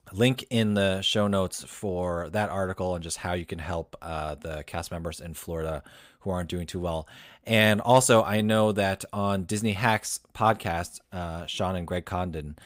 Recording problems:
none

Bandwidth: 15.5 kHz